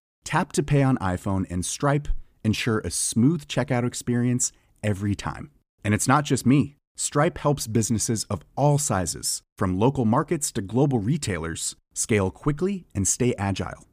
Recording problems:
none

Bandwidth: 15 kHz